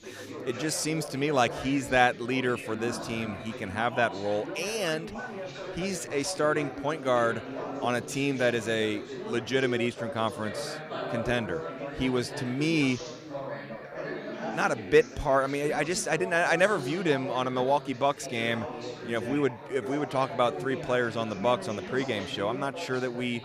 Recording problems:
background chatter; loud; throughout; 4 voices, 9 dB below the speech

